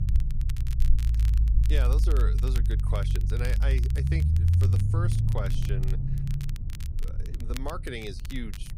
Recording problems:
low rumble; loud; throughout; 4 dB below the speech
crackle, like an old record; noticeable; 10 dB below the speech

